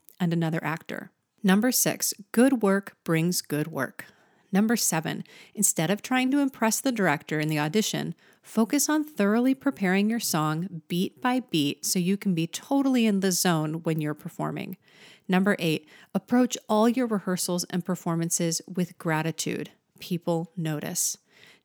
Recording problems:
none

